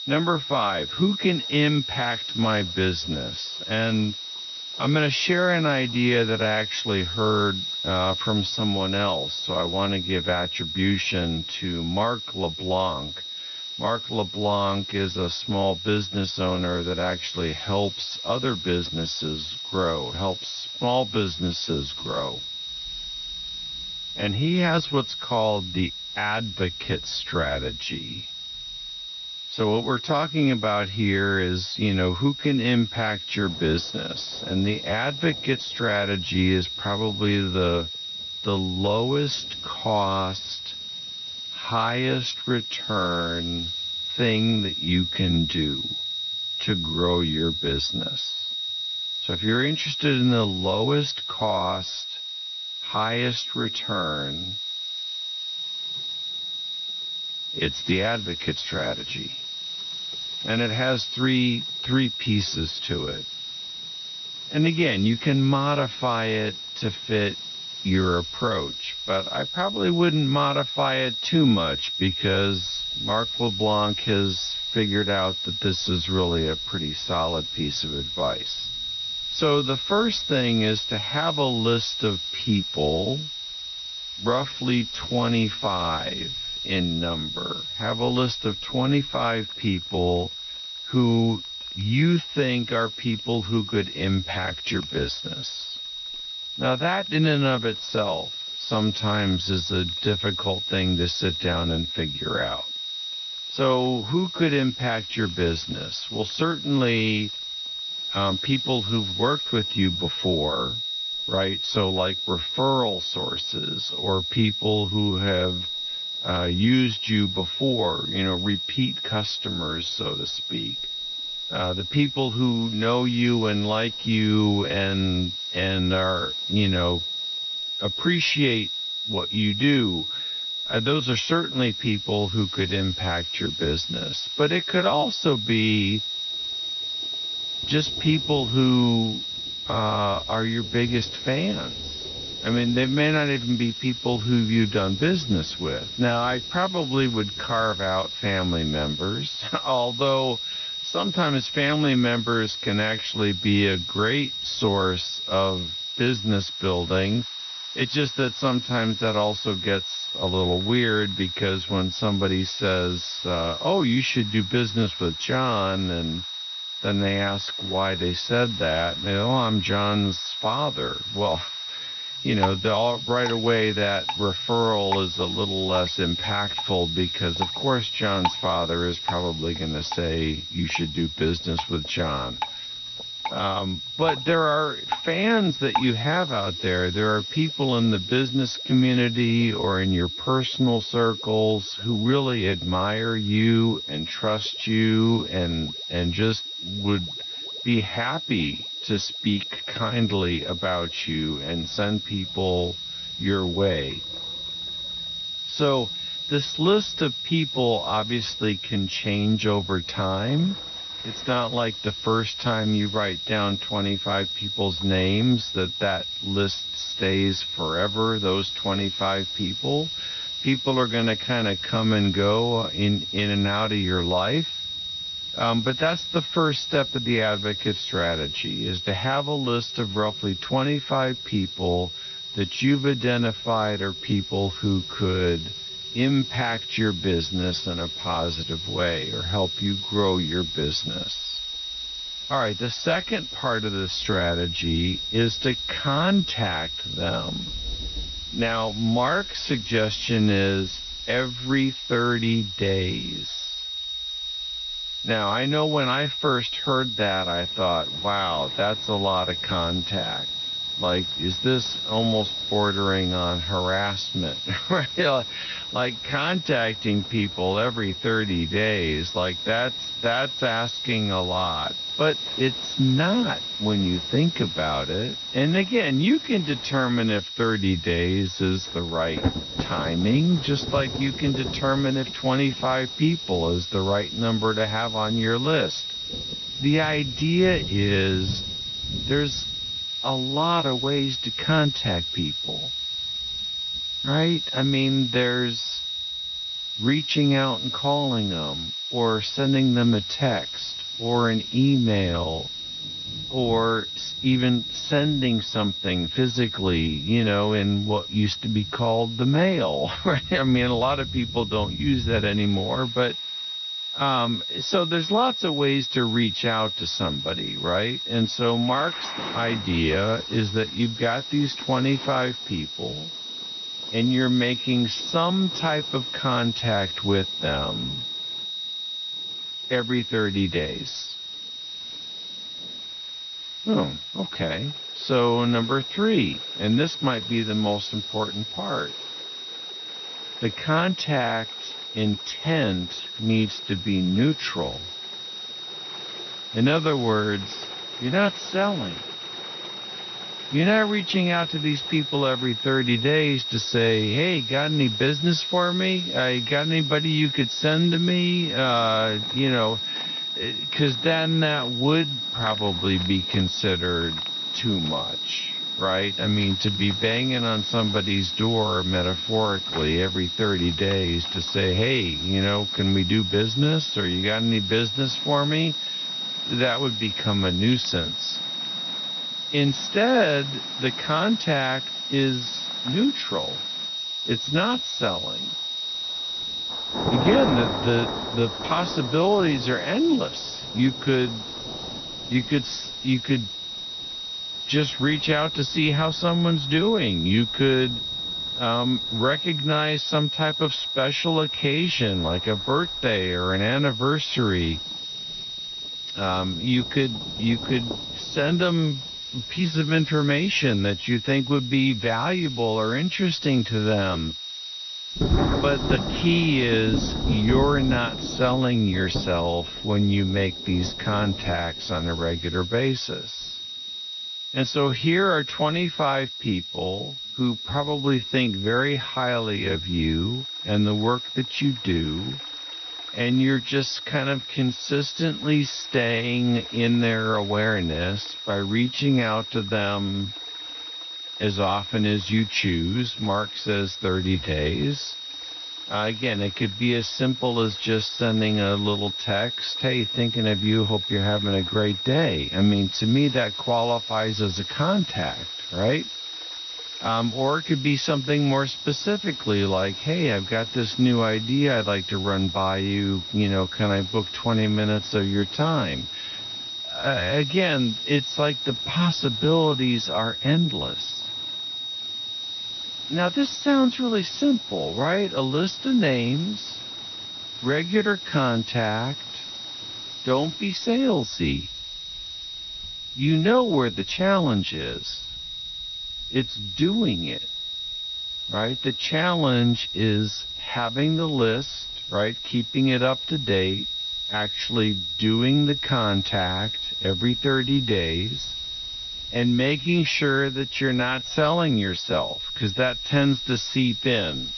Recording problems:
wrong speed, natural pitch; too slow; 0.6 times normal speed
garbled, watery; slightly; nothing above 6 kHz
high-pitched whine; loud; throughout; 4 kHz, 5 dB below the speech
rain or running water; noticeable; throughout; 15 dB below the speech
hiss; noticeable; throughout; 20 dB below the speech

